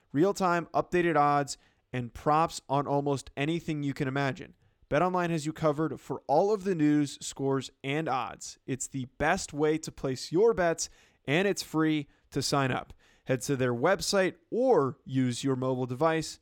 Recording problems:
none

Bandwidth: 18 kHz